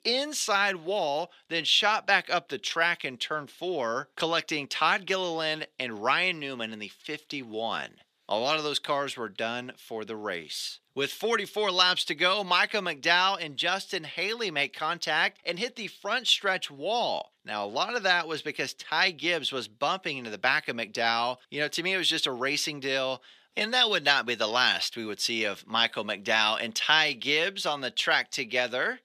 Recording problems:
thin; very; fading below 500 Hz

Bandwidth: 14.5 kHz